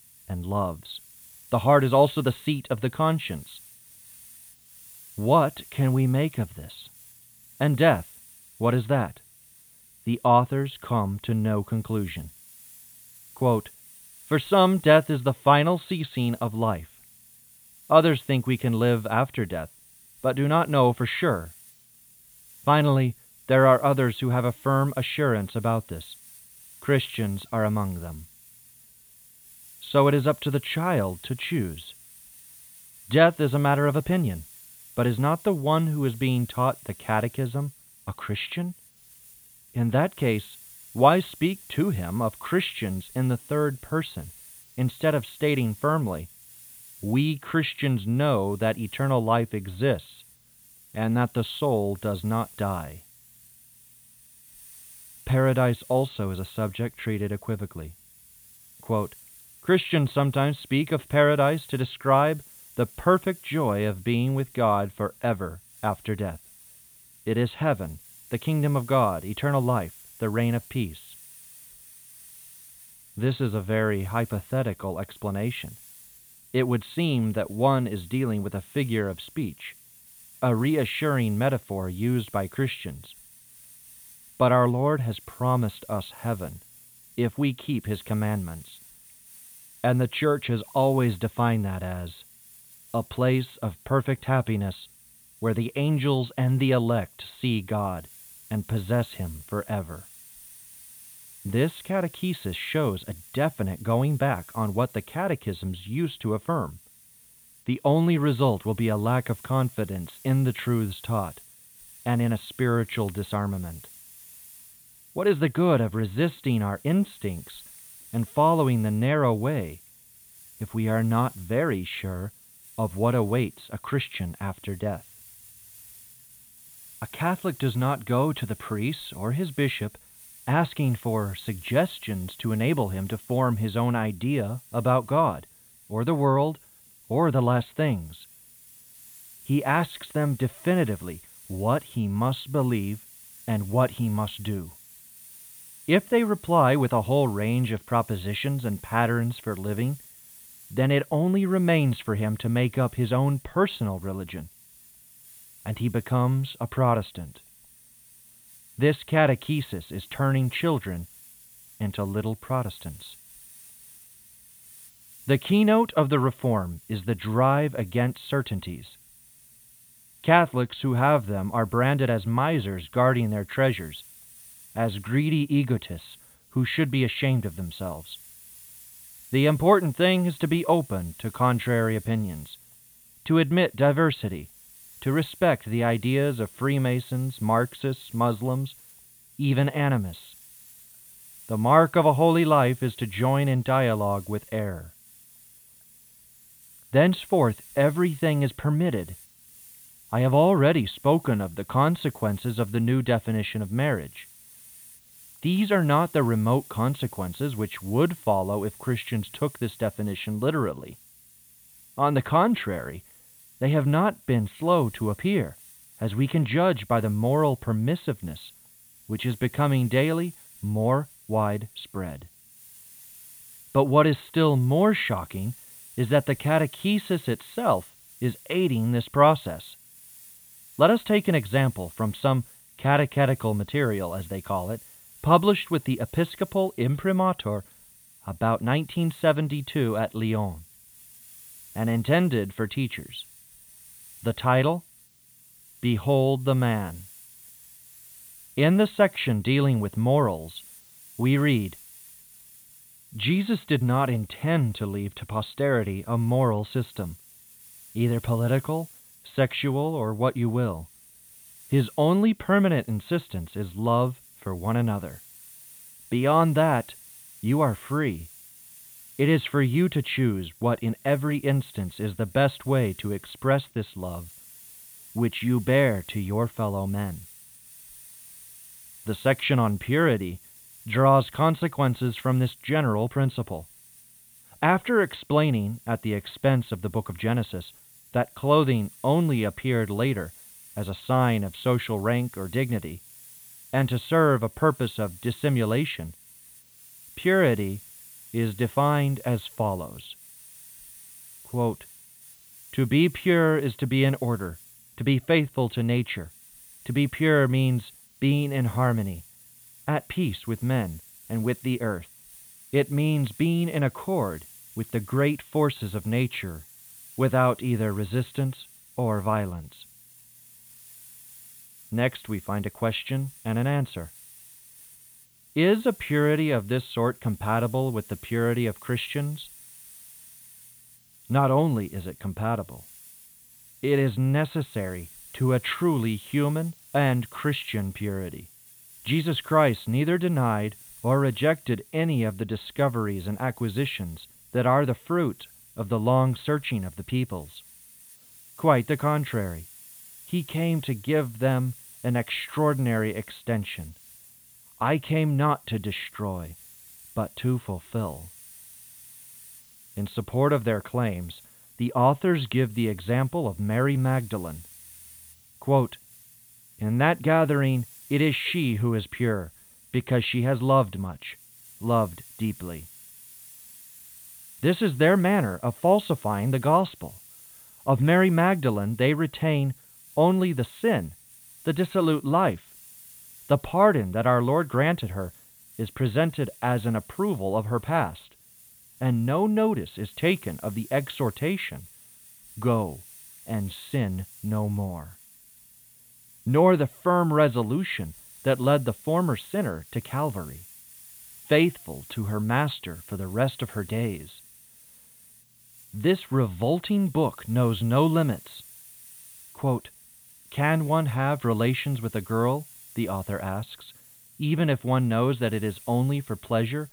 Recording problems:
high frequencies cut off; severe; nothing above 4 kHz
hiss; faint; throughout; 20 dB below the speech

